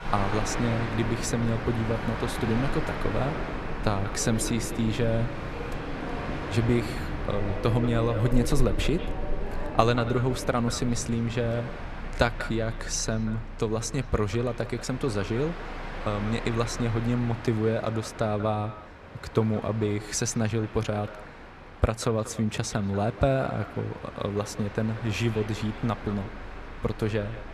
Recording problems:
echo of what is said; noticeable; throughout; 190 ms later, 15 dB below the speech
train or aircraft noise; loud; throughout; 8 dB below the speech

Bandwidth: 13.5 kHz